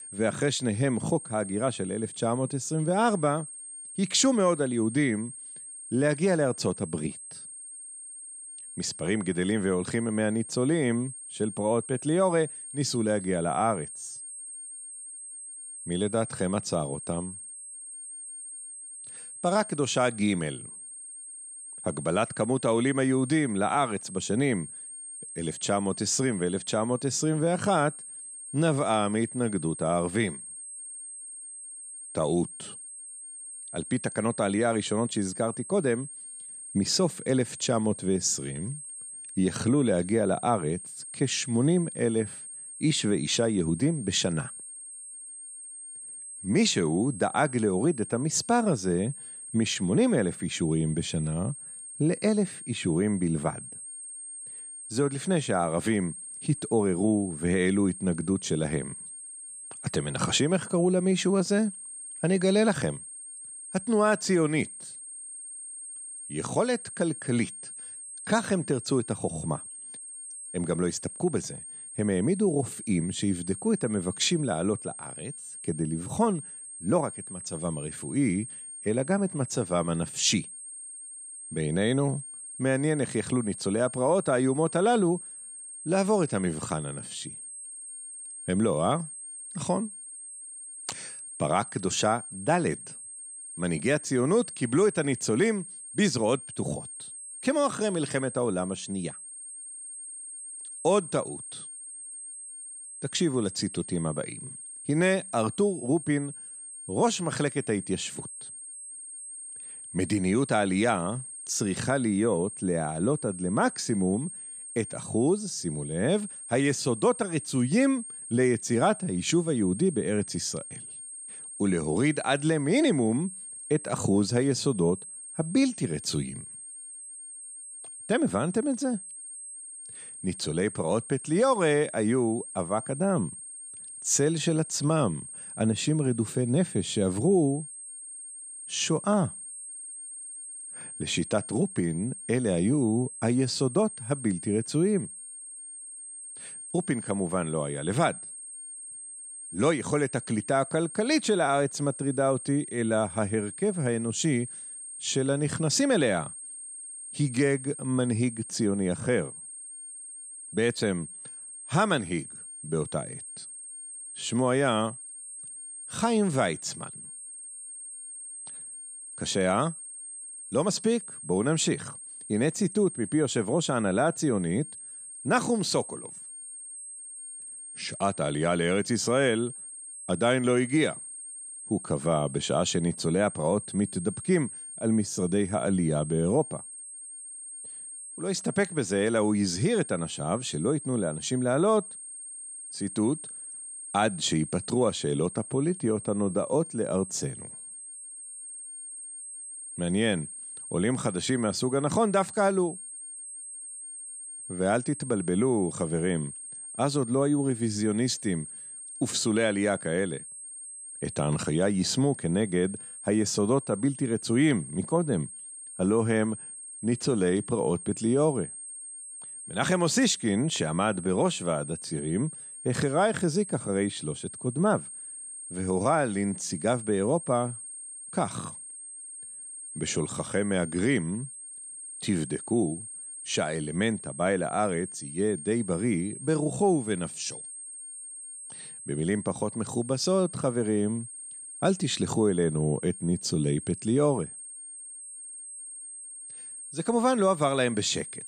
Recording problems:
high-pitched whine; noticeable; throughout; 8.5 kHz, 10 dB below the speech

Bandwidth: 14.5 kHz